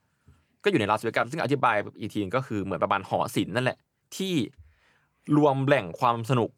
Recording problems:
none

